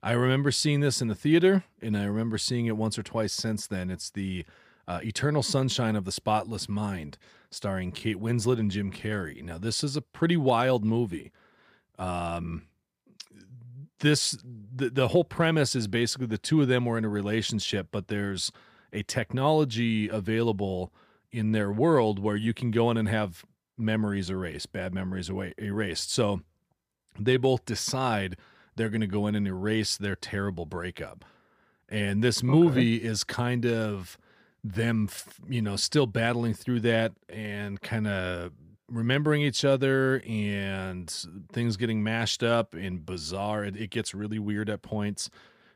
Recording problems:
none

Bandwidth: 15 kHz